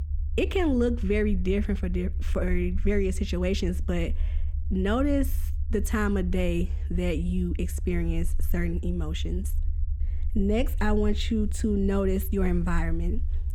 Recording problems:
low rumble; noticeable; throughout; 20 dB below the speech

